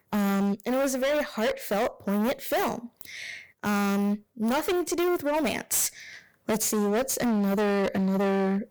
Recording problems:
distortion; heavy; 29% of the sound clipped

